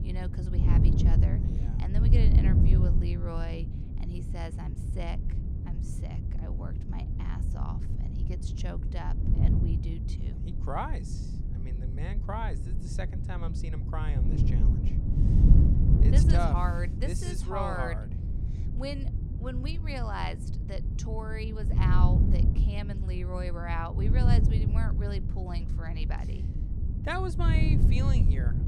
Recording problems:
wind noise on the microphone; heavy; 4 dB below the speech

